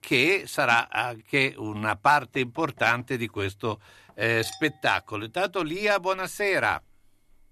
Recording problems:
household noises; faint; from 2.5 s on; 20 dB below the speech

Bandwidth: 13.5 kHz